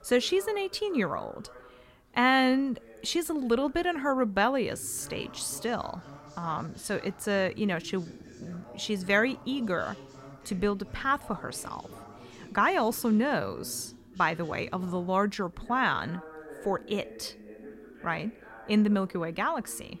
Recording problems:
voice in the background; noticeable; throughout; 20 dB below the speech

